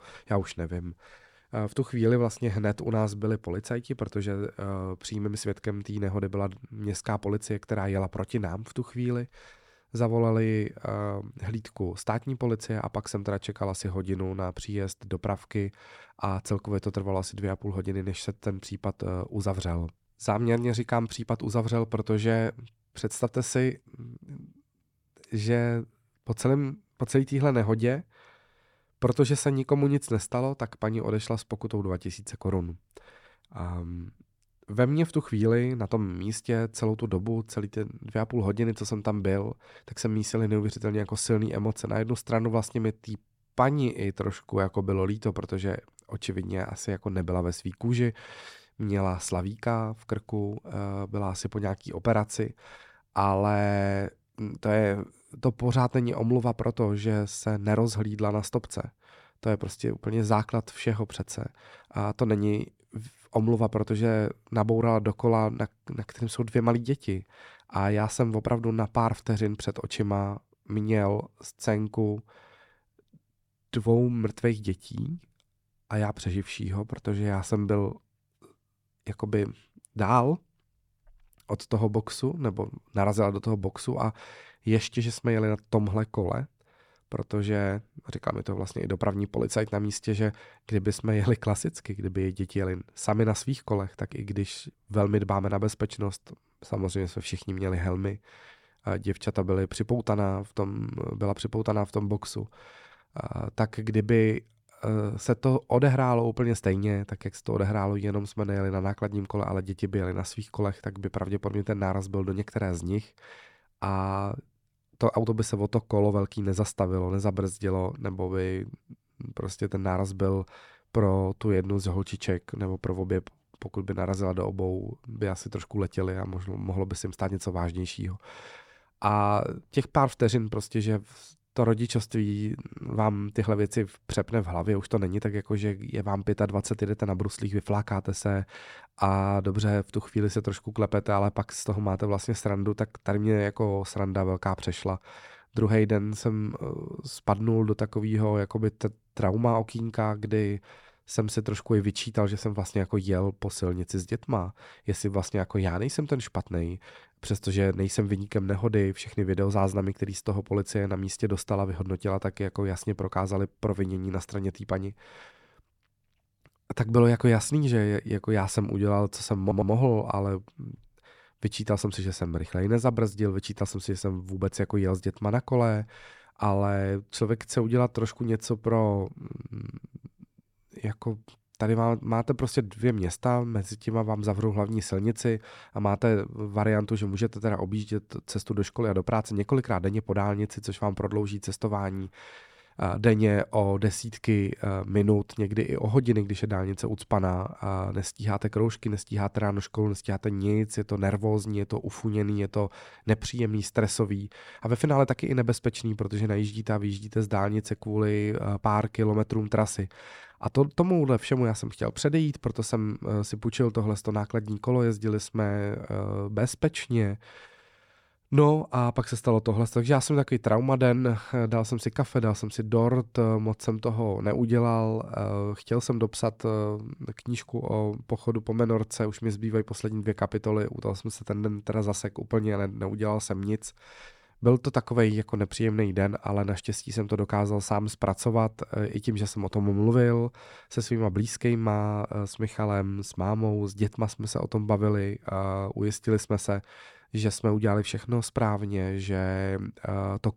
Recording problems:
audio stuttering; at 2:49

